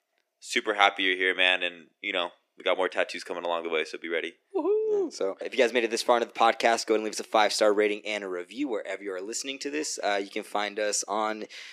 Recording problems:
thin; somewhat; fading below 300 Hz

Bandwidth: 15 kHz